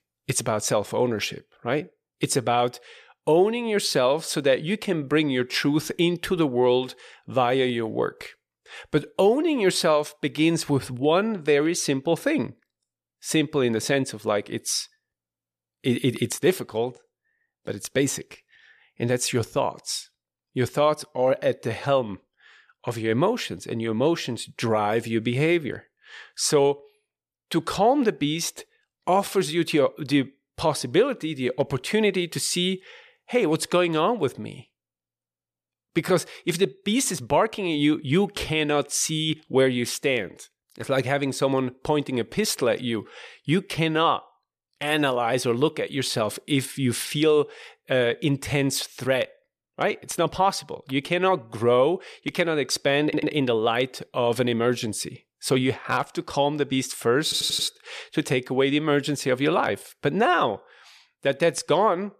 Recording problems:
audio stuttering; at 53 s and at 57 s

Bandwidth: 14.5 kHz